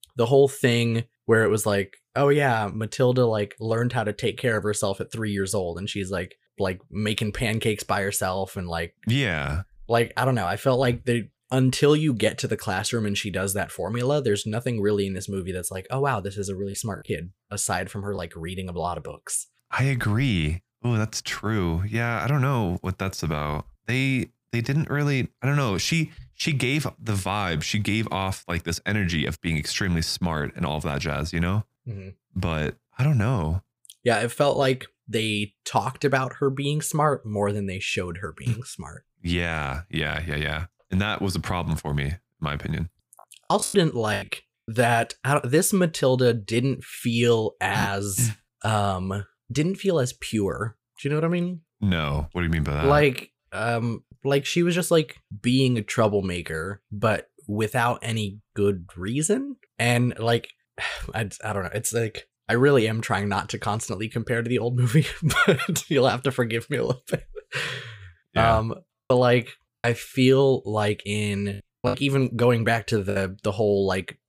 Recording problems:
choppy; very; at 44 s and from 1:09 to 1:13; 5% of the speech affected

